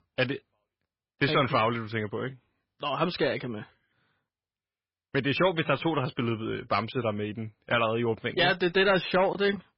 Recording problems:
garbled, watery; badly; nothing above 5 kHz
distortion; slight; 4% of the sound clipped

